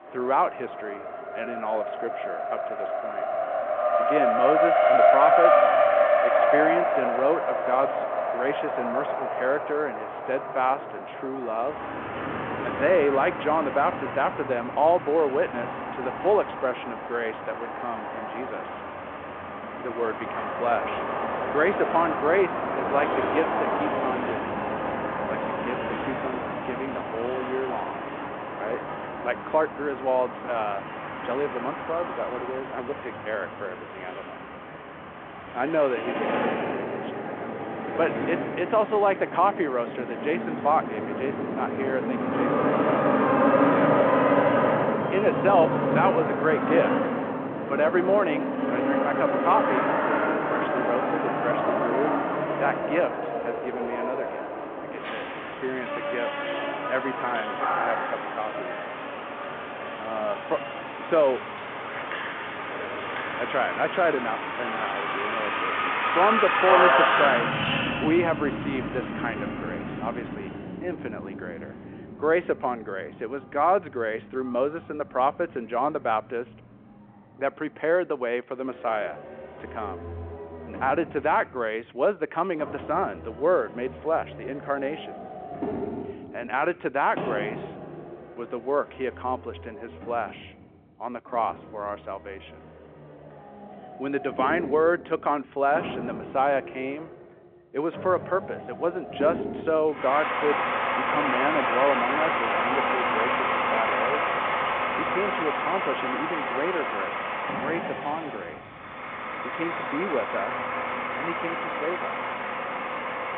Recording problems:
phone-call audio
traffic noise; very loud; throughout; 1 dB above the speech

